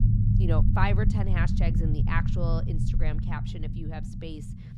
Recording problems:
low rumble; loud; throughout; 5 dB below the speech

